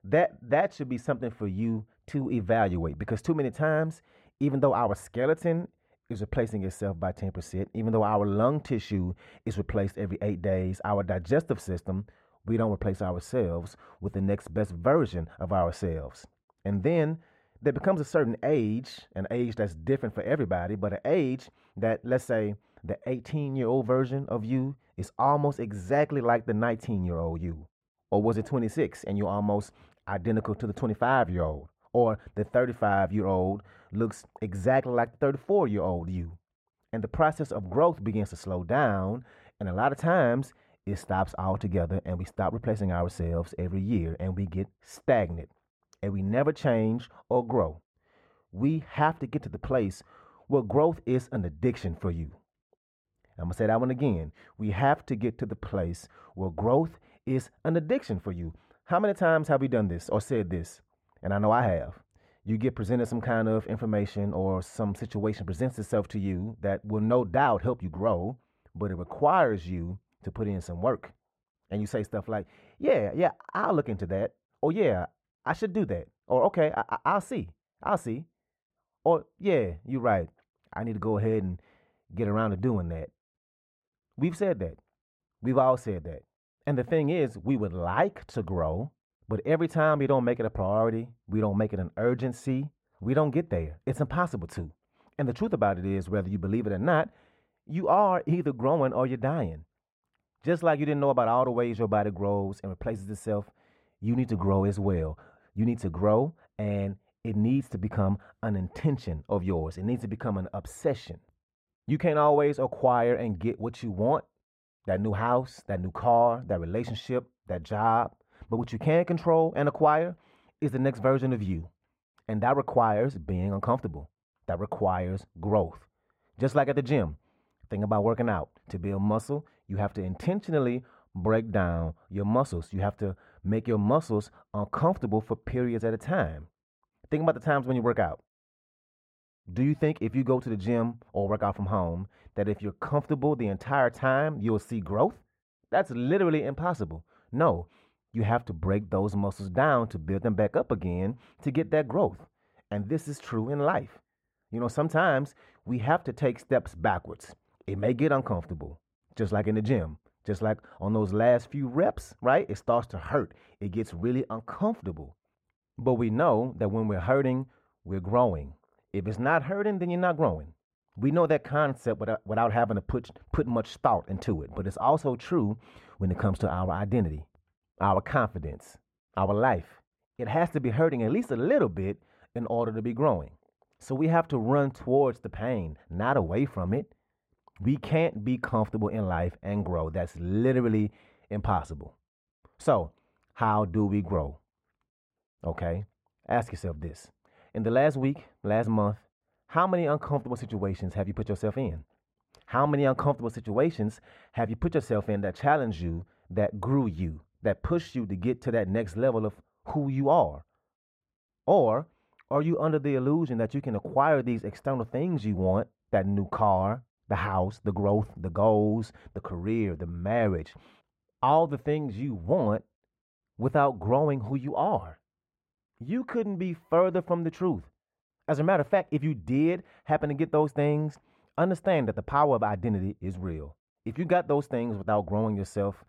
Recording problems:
muffled; very; fading above 3.5 kHz

